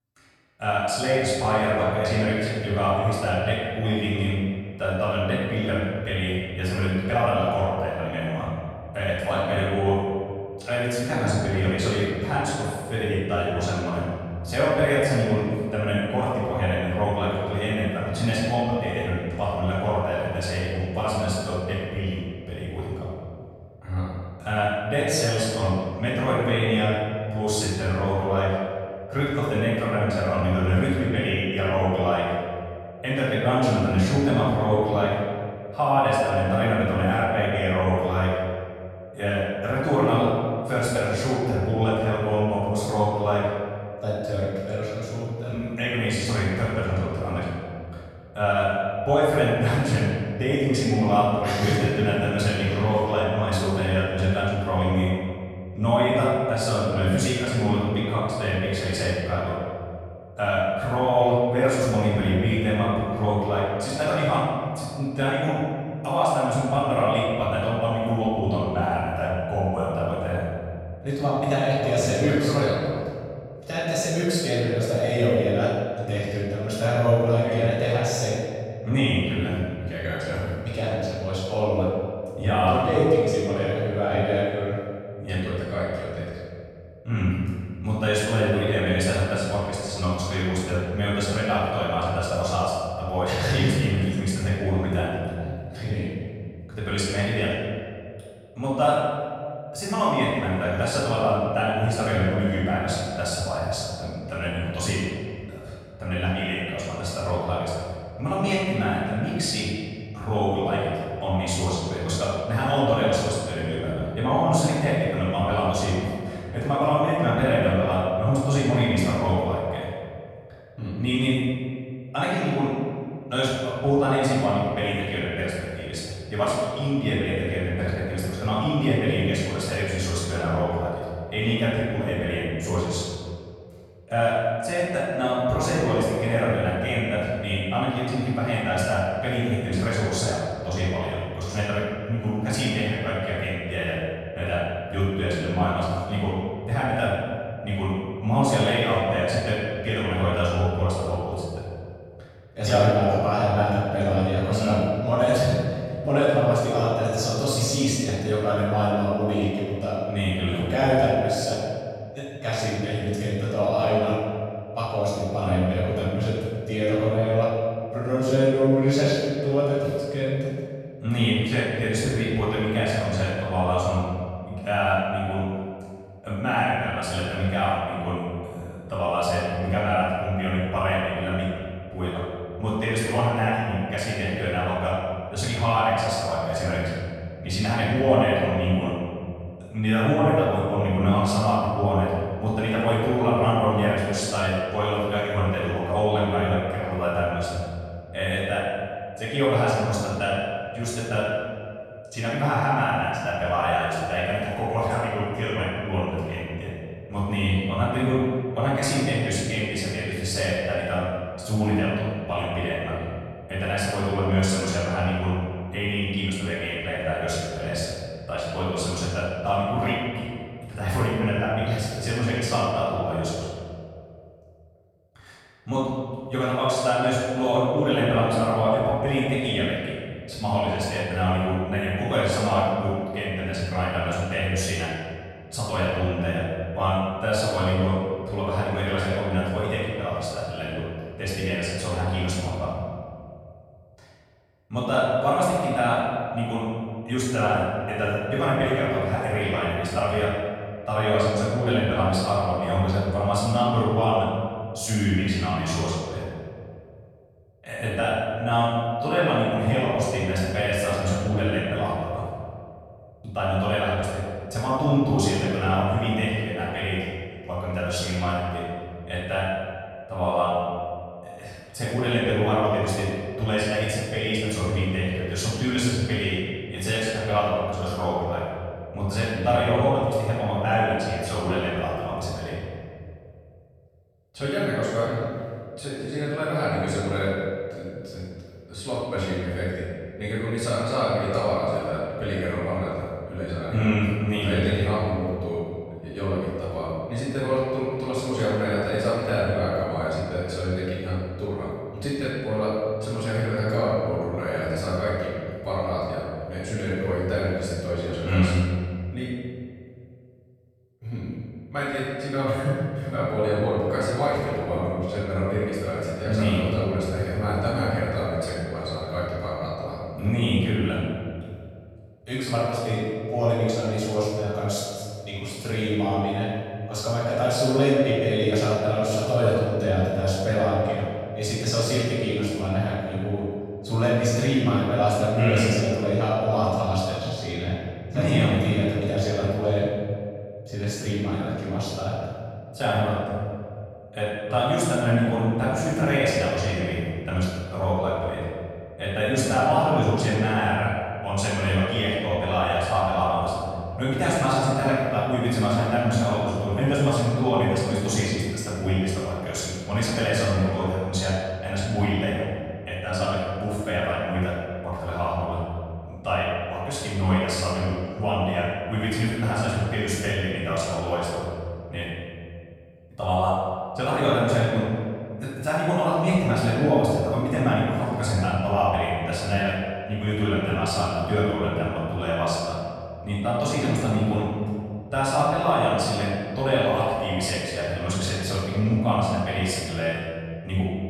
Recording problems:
room echo; strong; dies away in 2.1 s
off-mic speech; far

